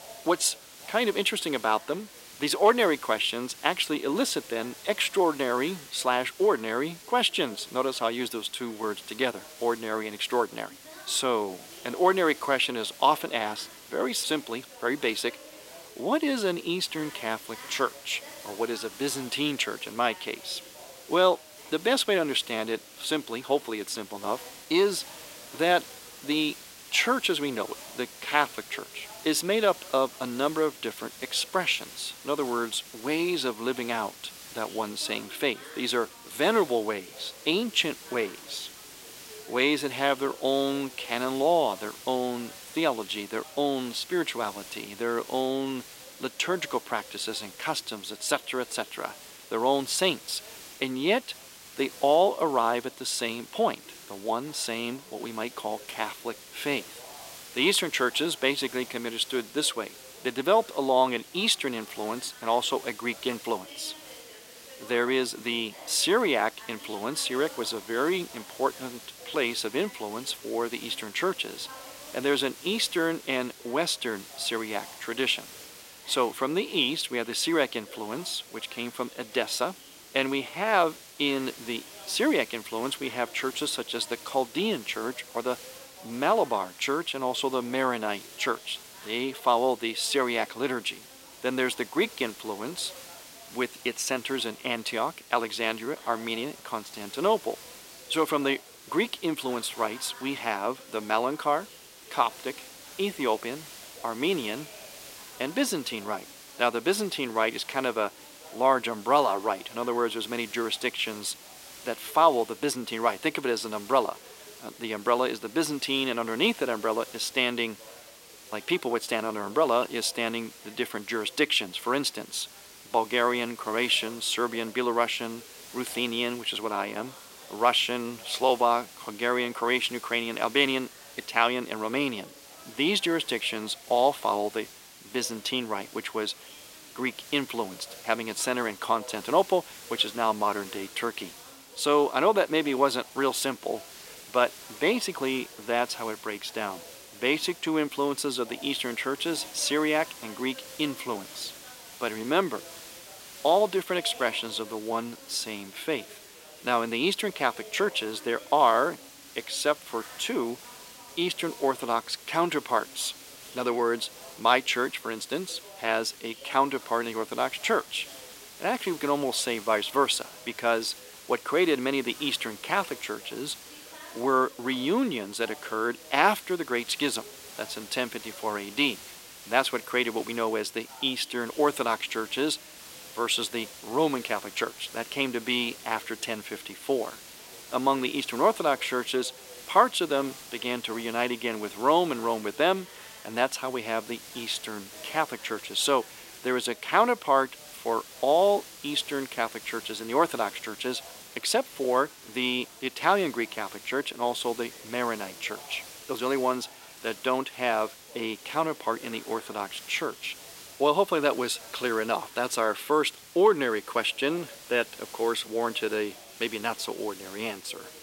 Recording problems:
thin; somewhat; fading below 350 Hz
hiss; noticeable; throughout; 15 dB below the speech
background chatter; faint; throughout; 4 voices, 25 dB below the speech

